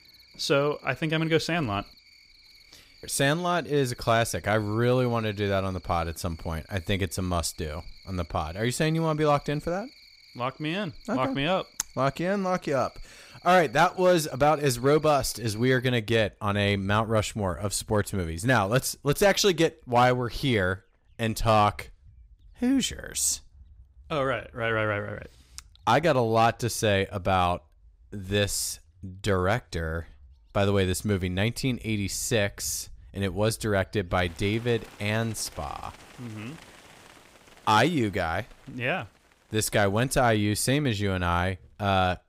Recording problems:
animal sounds; faint; throughout; 25 dB below the speech

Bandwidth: 15.5 kHz